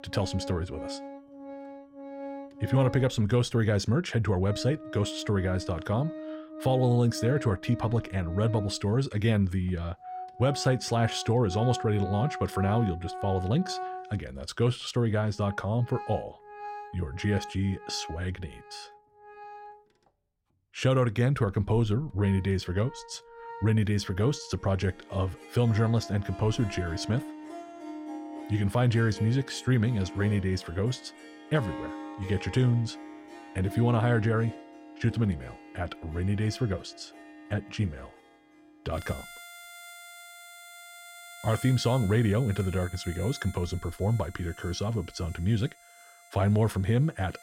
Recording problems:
background music; noticeable; throughout; 15 dB below the speech

